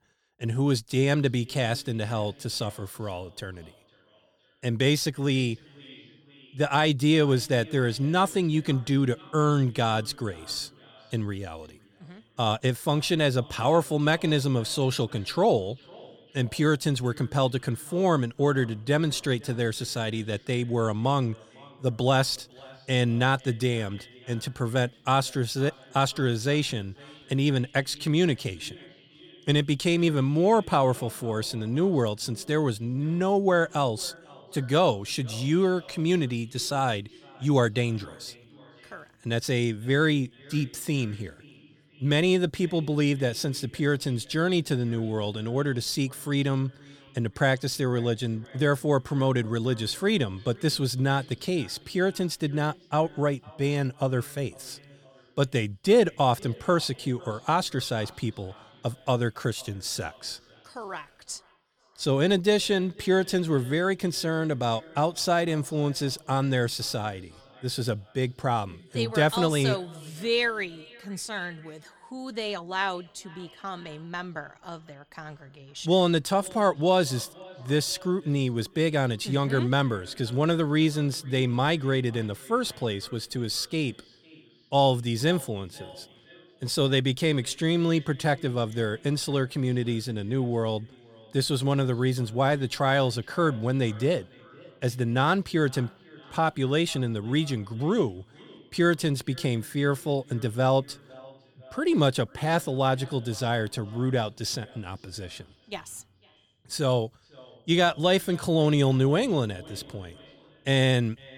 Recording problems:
echo of what is said; faint; throughout; 500 ms later, 25 dB below the speech

